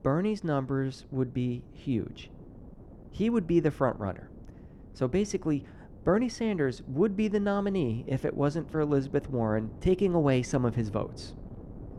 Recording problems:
muffled; slightly; fading above 2 kHz
wind noise on the microphone; occasional gusts; 25 dB below the speech

